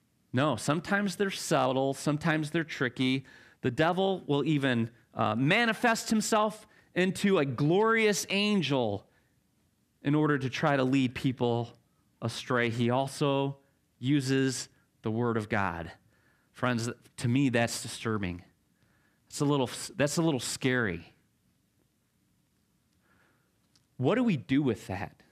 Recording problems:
none

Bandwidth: 14.5 kHz